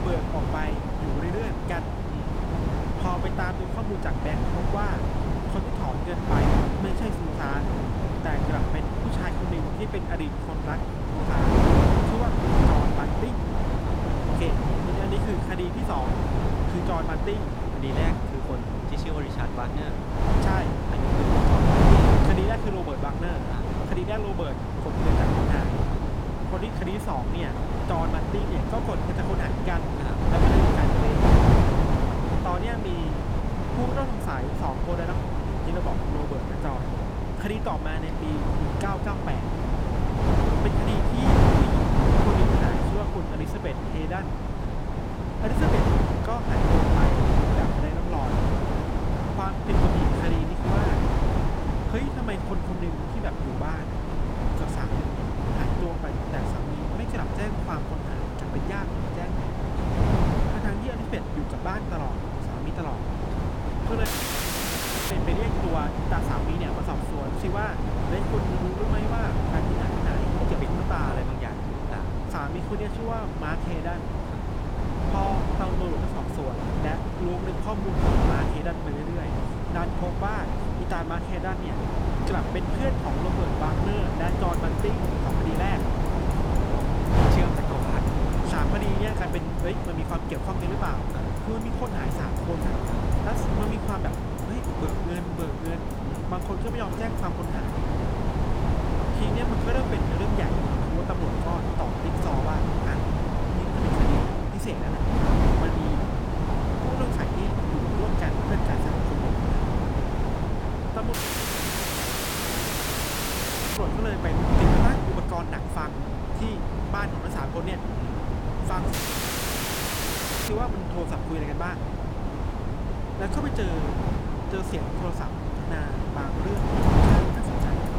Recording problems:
wind noise on the microphone; heavy; 3 dB above the speech
traffic noise; faint; throughout; 20 dB below the speech
audio cutting out; at 1:04 for 1 s, at 1:51 for 2.5 s and at 1:59 for 1.5 s

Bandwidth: 18 kHz